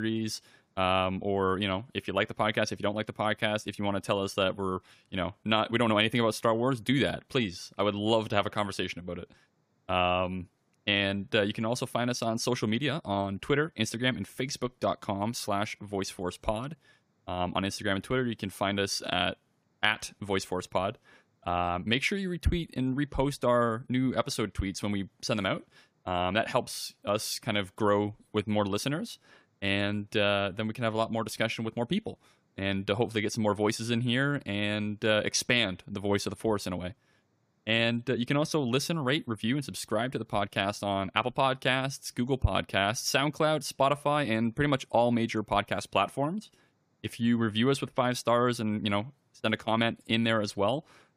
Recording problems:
abrupt cut into speech; at the start

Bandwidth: 15 kHz